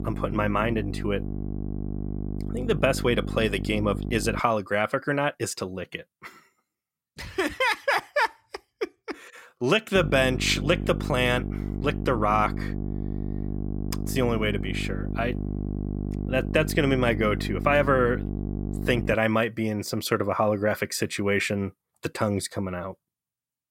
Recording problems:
electrical hum; noticeable; until 4.5 s and from 10 to 19 s; 50 Hz, 15 dB below the speech

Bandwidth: 16 kHz